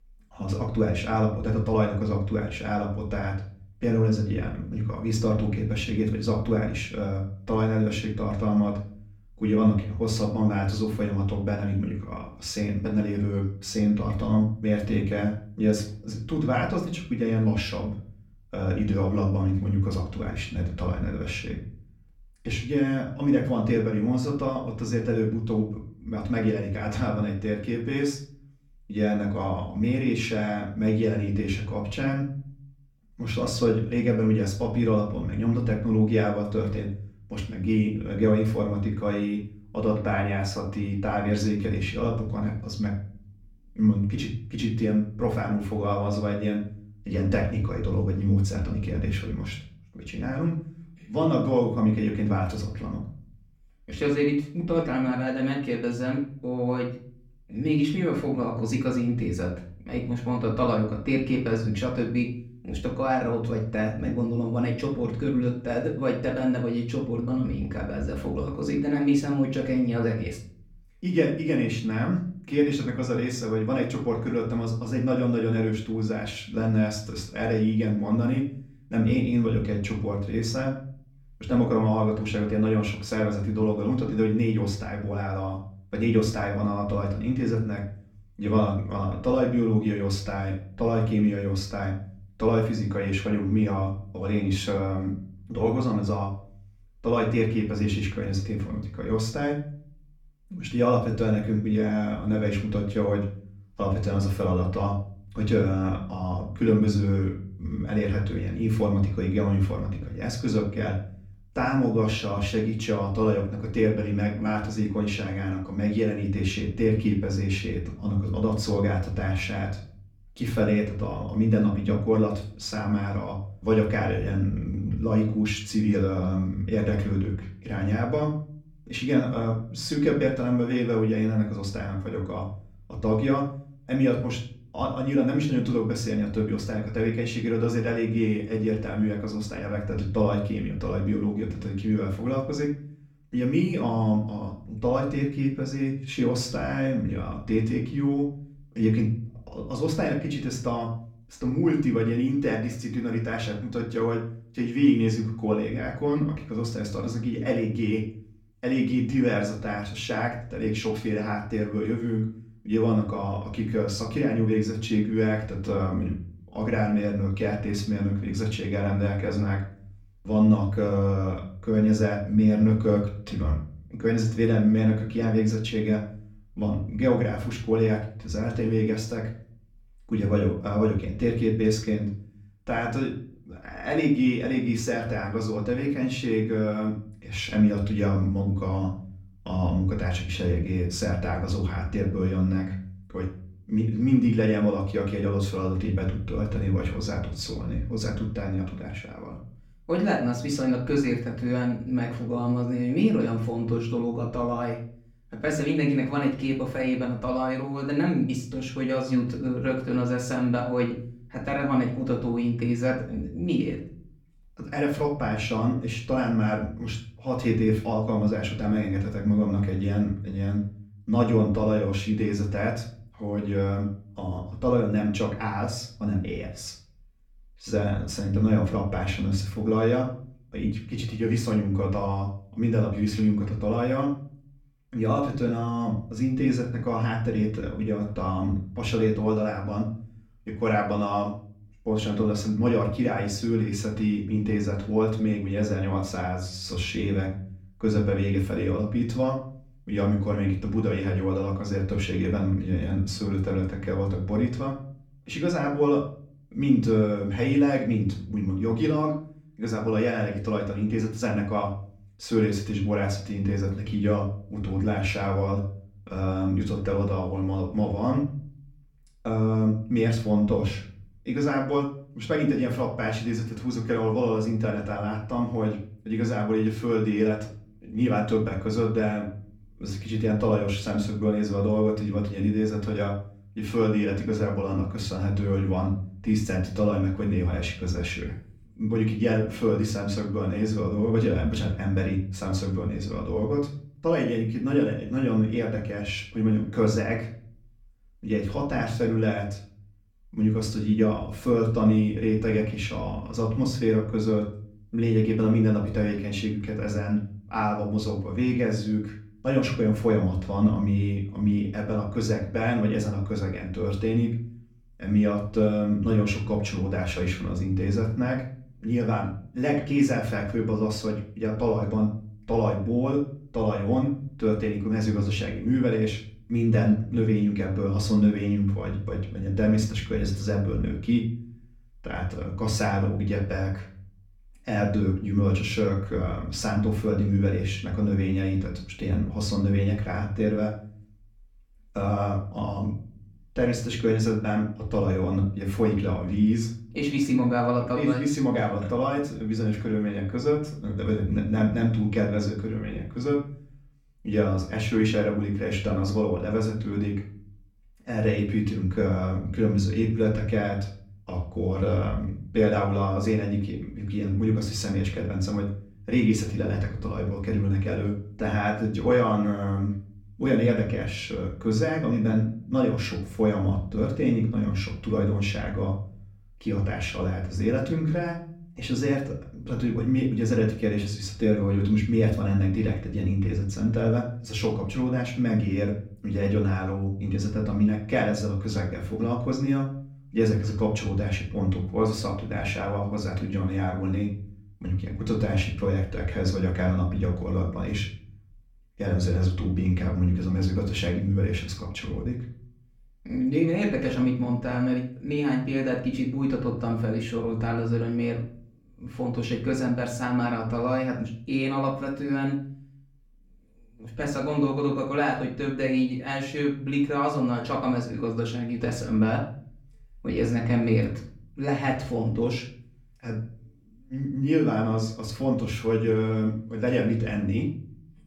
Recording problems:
off-mic speech; far
room echo; slight; dies away in 0.4 s

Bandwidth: 18.5 kHz